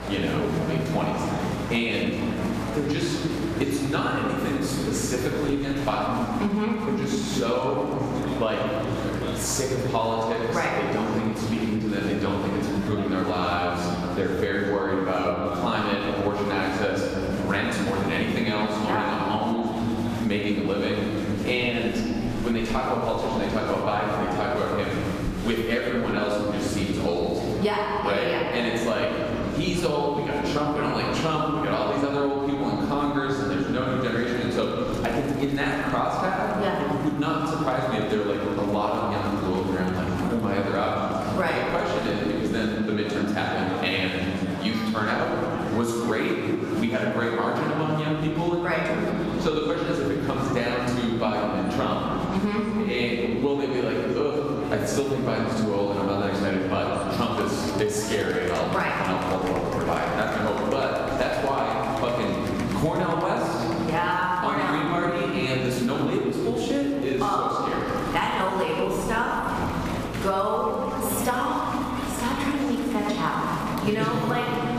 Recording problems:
off-mic speech; far
room echo; noticeable; dies away in 2.4 s
squashed, flat; somewhat
murmuring crowd; noticeable; throughout; 10 dB below the speech
electrical hum; faint; until 43 s and from 48 s on; 60 Hz, 25 dB below the speech

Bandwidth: 14.5 kHz